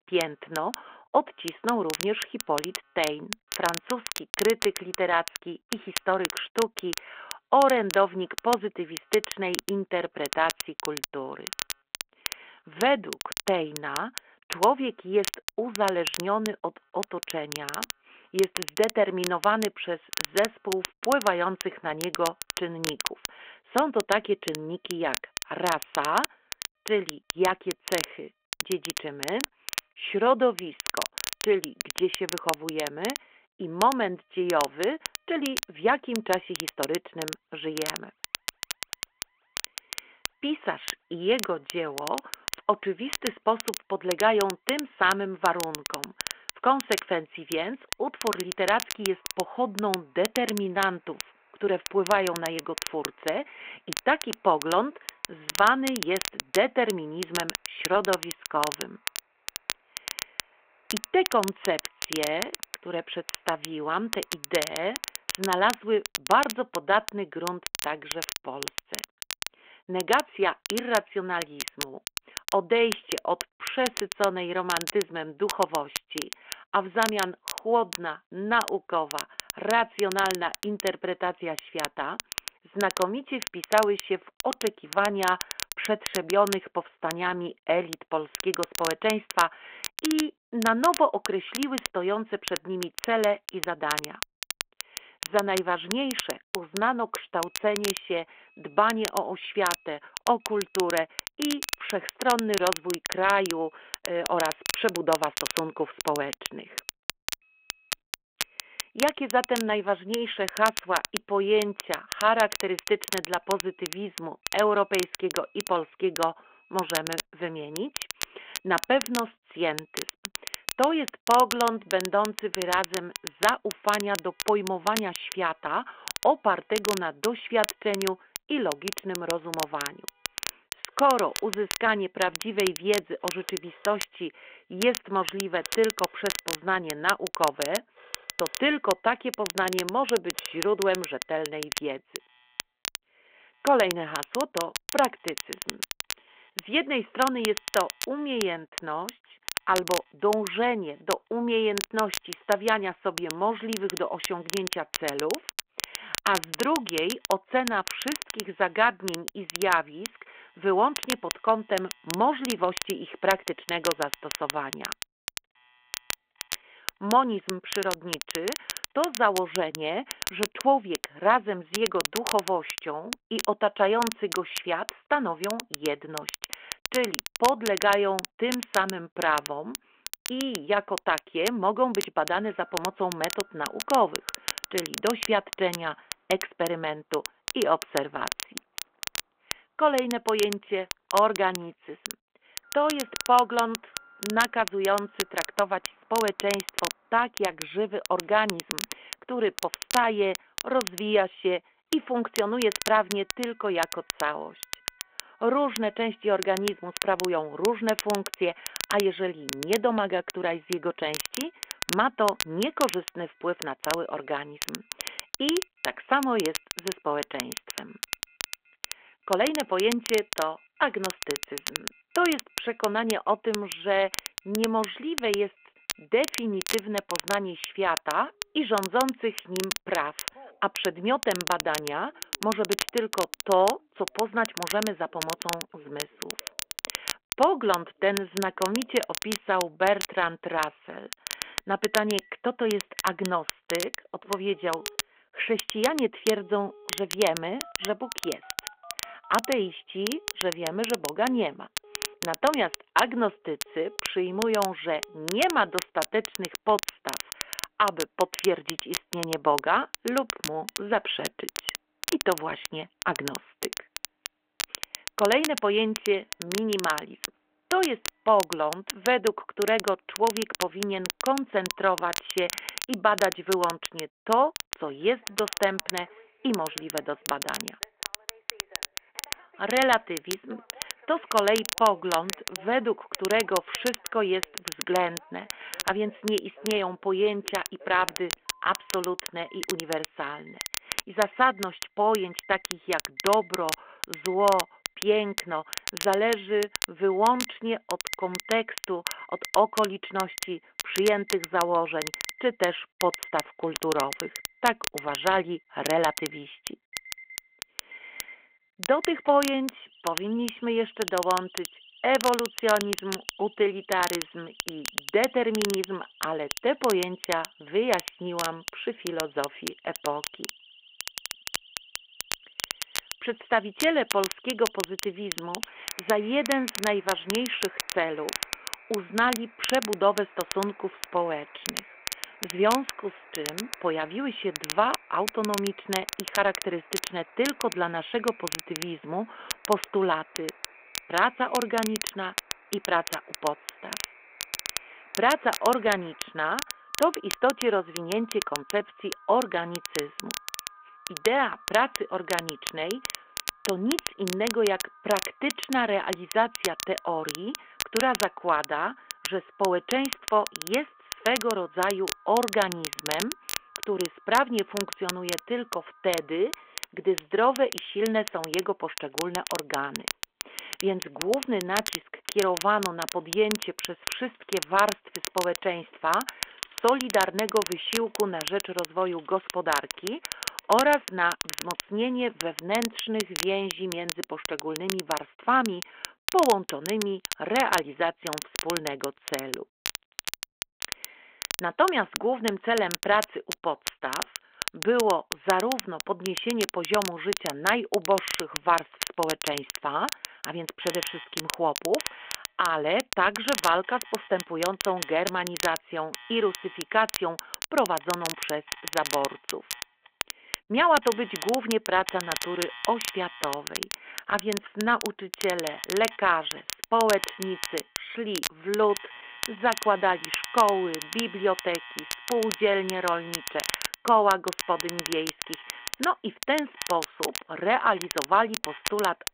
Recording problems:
phone-call audio
crackle, like an old record; loud; 8 dB below the speech
alarms or sirens; faint; throughout; 25 dB below the speech

